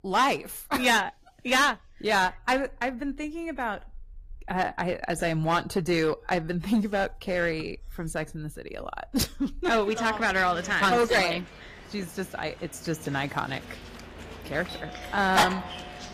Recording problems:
distortion; heavy; 4% of the sound clipped
garbled, watery; slightly; nothing above 15.5 kHz
animal sounds; loud; throughout; 8 dB below the speech

